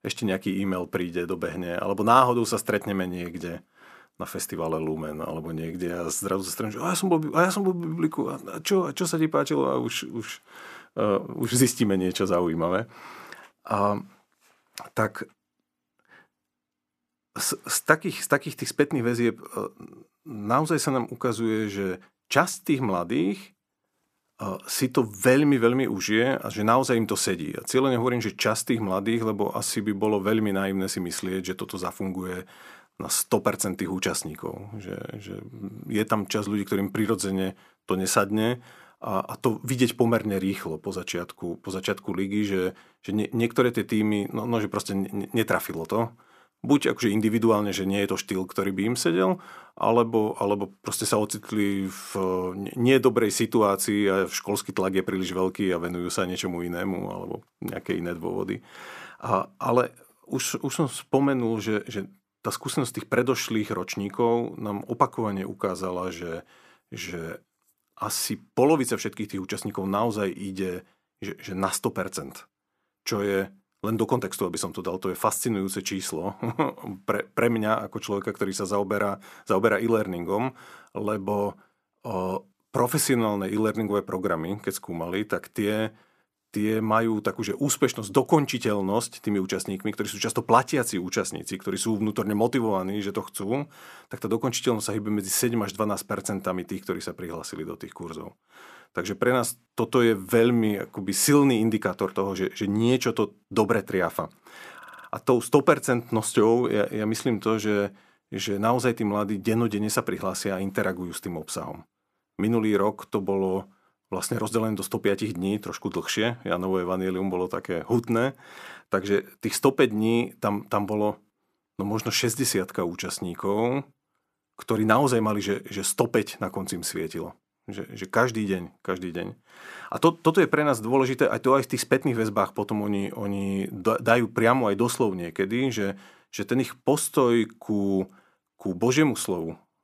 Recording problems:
audio stuttering; at 1:45

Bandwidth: 14.5 kHz